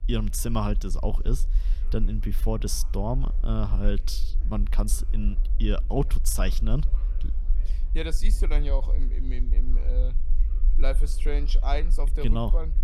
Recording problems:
low rumble; noticeable; throughout; 20 dB below the speech
chatter from many people; faint; throughout; 25 dB below the speech

